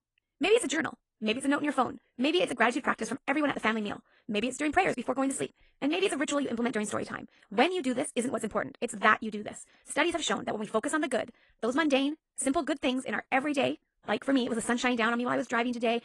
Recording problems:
wrong speed, natural pitch; too fast; 1.8 times normal speed
garbled, watery; slightly; nothing above 10 kHz

